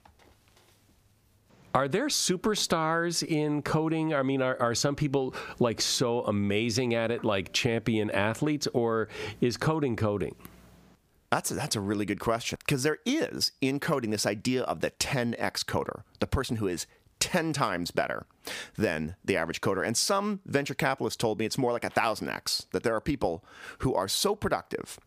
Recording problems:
squashed, flat; somewhat

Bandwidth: 15 kHz